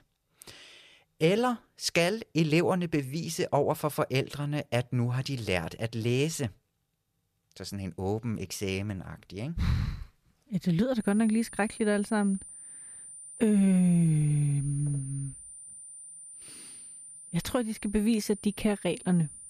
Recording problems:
high-pitched whine; noticeable; from 11 s on; 9 kHz, 15 dB below the speech

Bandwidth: 14.5 kHz